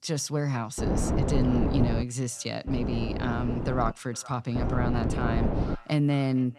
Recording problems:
echo of what is said; faint; throughout; 460 ms later, 25 dB below the speech
wind noise on the microphone; heavy; from 1 to 2 s, from 2.5 to 4 s and from 4.5 to 6 s; 2 dB below the speech

